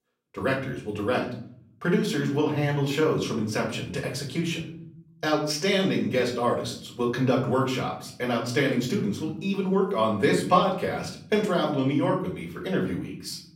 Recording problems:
off-mic speech; far
room echo; slight; dies away in 0.8 s

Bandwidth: 16 kHz